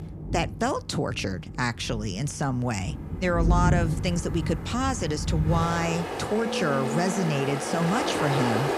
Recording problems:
rain or running water; loud; throughout; 2 dB below the speech

